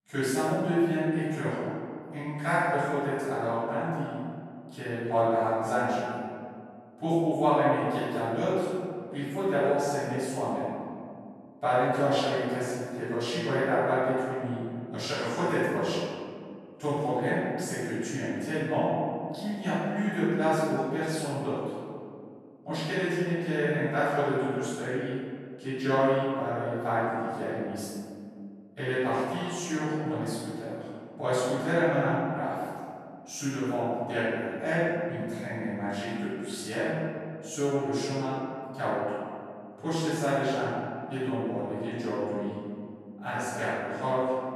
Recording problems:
room echo; strong; dies away in 2.1 s
off-mic speech; far

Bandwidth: 13.5 kHz